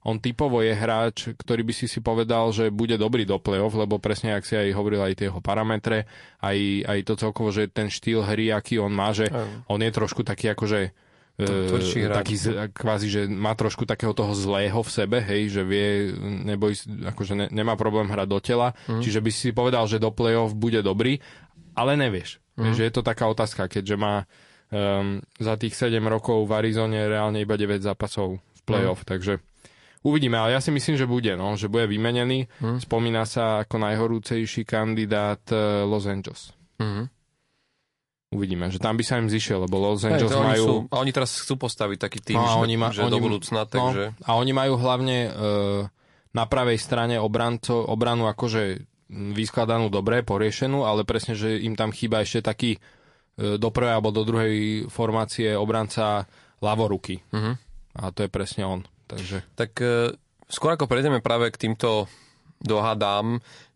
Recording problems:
garbled, watery; slightly

